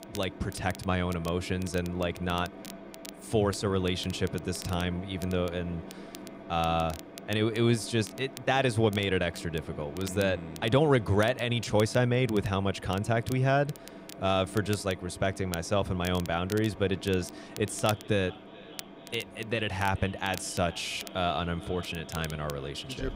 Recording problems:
echo of what is said; faint; from 18 s on; 430 ms later, 20 dB below the speech
machinery noise; noticeable; throughout; 15 dB below the speech
crackle, like an old record; noticeable; 20 dB below the speech

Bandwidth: 15.5 kHz